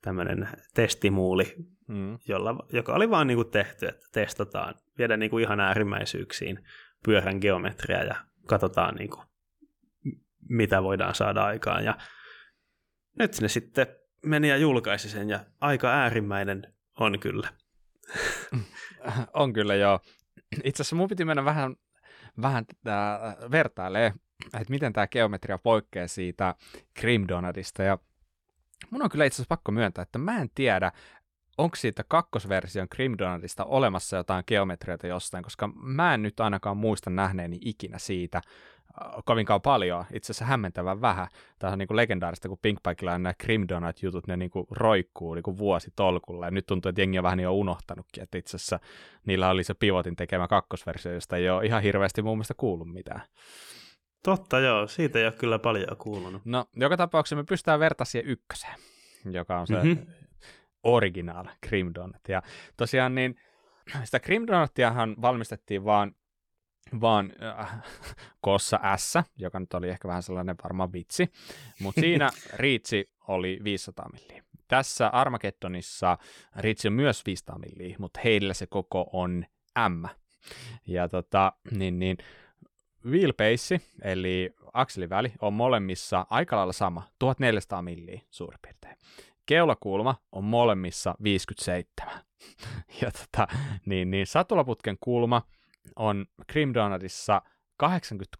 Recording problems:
none

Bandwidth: 18 kHz